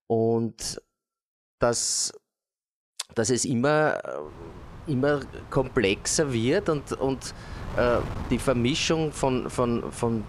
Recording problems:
wind noise on the microphone; occasional gusts; from 4.5 s on; 15 dB below the speech

